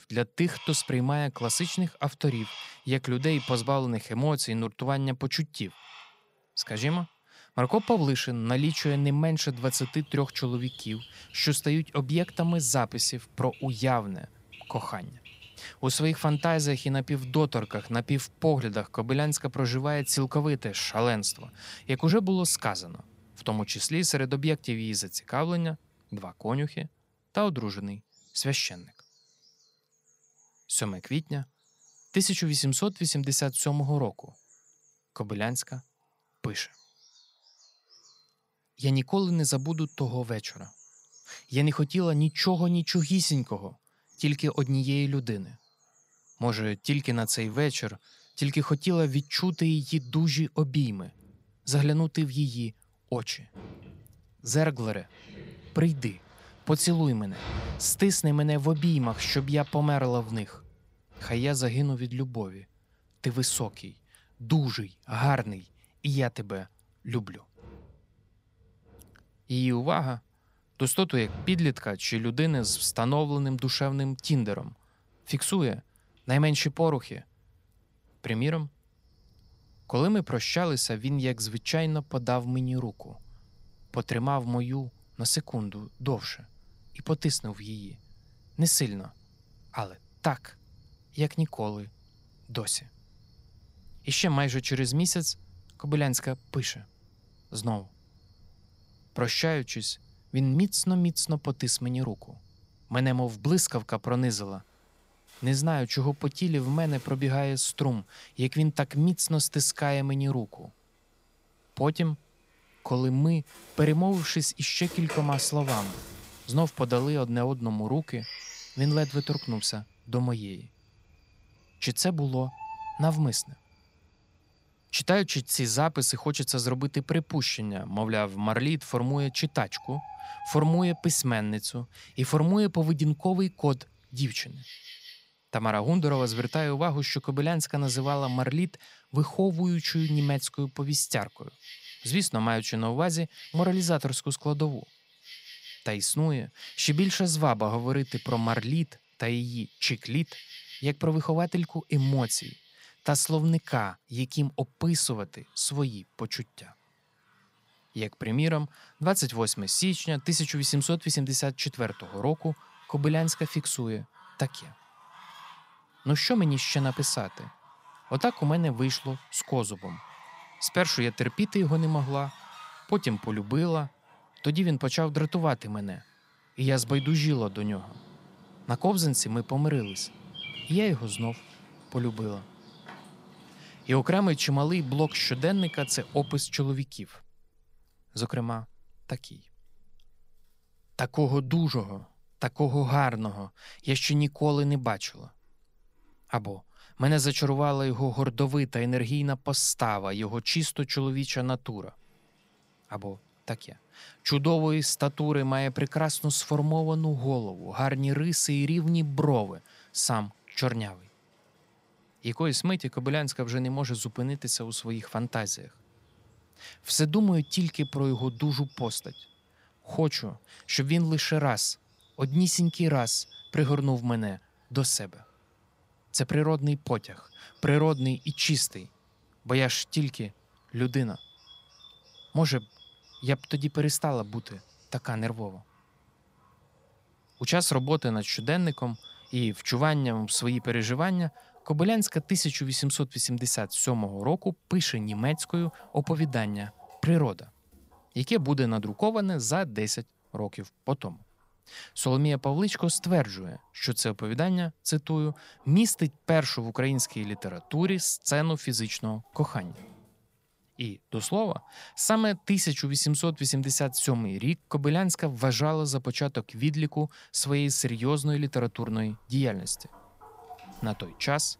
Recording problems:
animal sounds; faint; throughout; 20 dB below the speech

